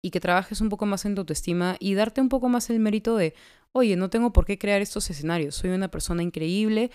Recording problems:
none

